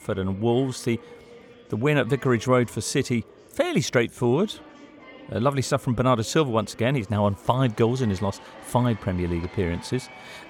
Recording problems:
murmuring crowd; faint; throughout; 20 dB below the speech

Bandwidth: 17 kHz